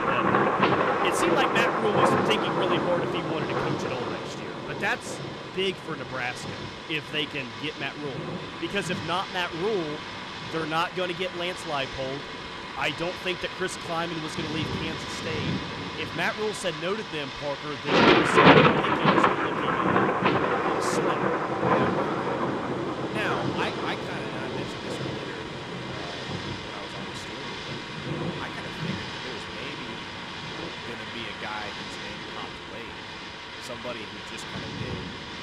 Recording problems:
rain or running water; very loud; throughout; 5 dB above the speech

